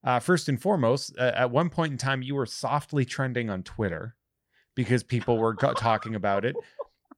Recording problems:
none

